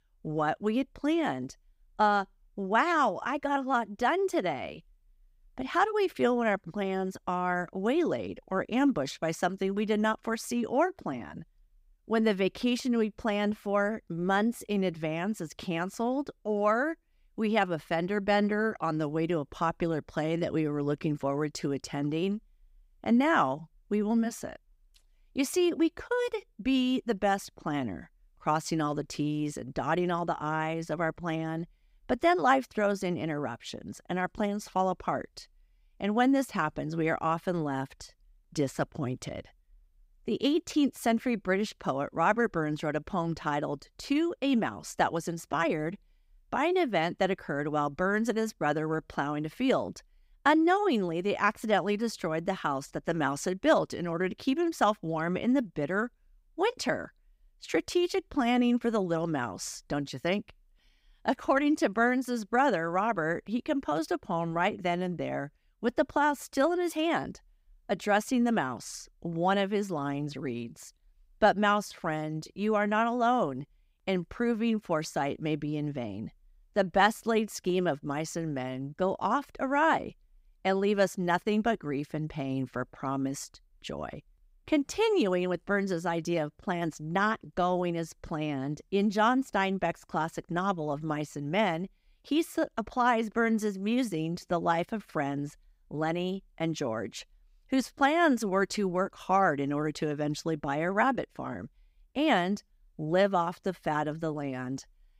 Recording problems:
none

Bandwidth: 15.5 kHz